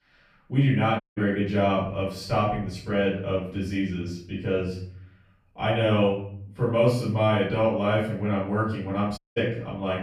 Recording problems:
off-mic speech; far
room echo; noticeable; dies away in 0.6 s
audio cutting out; at 1 s and at 9 s

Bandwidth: 15 kHz